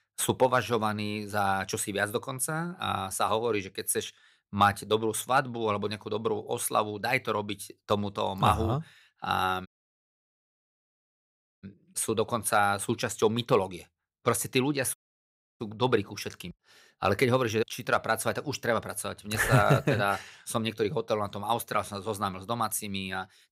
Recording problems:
audio cutting out; at 9.5 s for 2 s and at 15 s for 0.5 s

